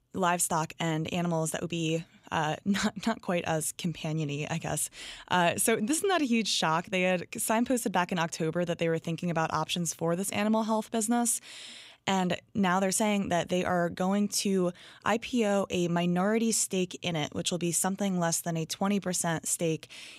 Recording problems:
none

